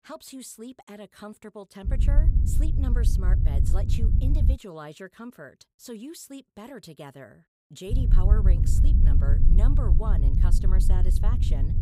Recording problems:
low rumble; loud; from 2 to 4.5 s and from 8 s on; as loud as the speech

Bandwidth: 15.5 kHz